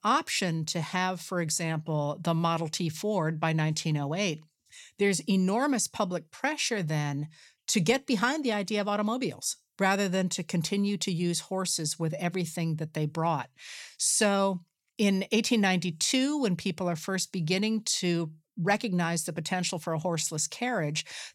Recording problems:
none

